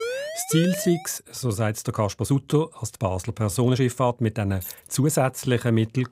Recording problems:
siren; noticeable; until 1 s; peak 5 dB below the speech
uneven, jittery; strongly; from 0.5 to 5.5 s
jangling keys; faint; at 4.5 s; peak 15 dB below the speech

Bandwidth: 15.5 kHz